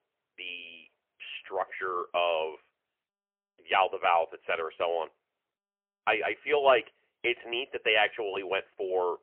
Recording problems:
phone-call audio; poor line; nothing above 3 kHz

